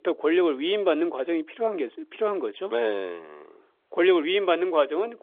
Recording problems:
phone-call audio; nothing above 3.5 kHz

